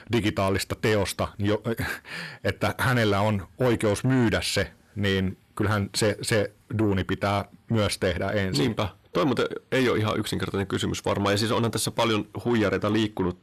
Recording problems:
distortion; slight; 10 dB below the speech

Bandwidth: 14 kHz